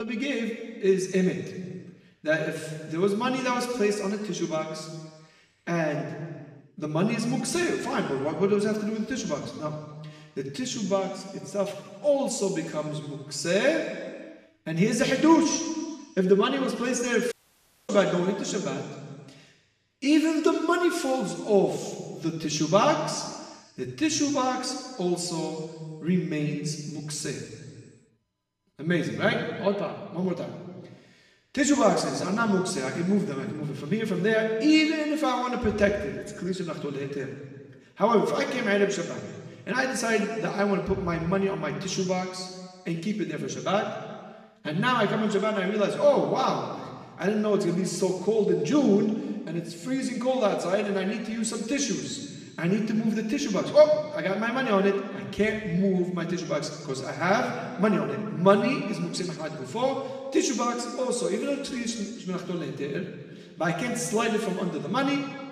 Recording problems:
room echo; noticeable; dies away in 1.5 s
off-mic speech; somewhat distant
abrupt cut into speech; at the start
audio cutting out; at 17 s for 0.5 s

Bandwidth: 14.5 kHz